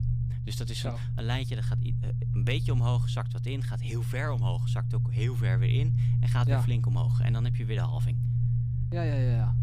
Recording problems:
low rumble; loud; throughout; 2 dB below the speech

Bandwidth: 15 kHz